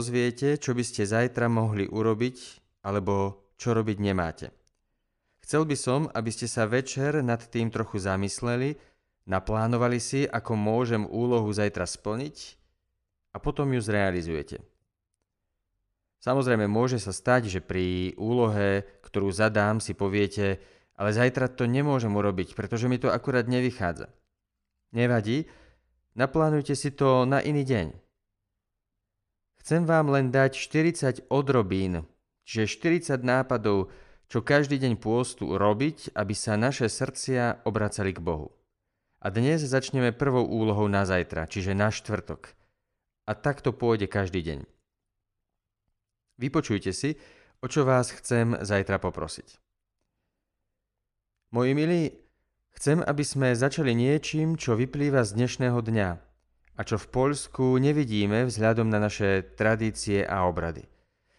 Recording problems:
abrupt cut into speech; at the start

